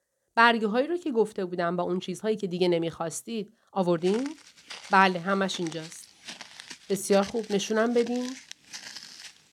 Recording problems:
uneven, jittery; strongly; from 1.5 to 7.5 s
footsteps; faint; from 4 s on; peak 15 dB below the speech

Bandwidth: 18 kHz